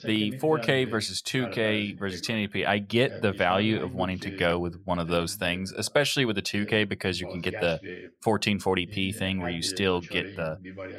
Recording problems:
voice in the background; noticeable; throughout; 15 dB below the speech

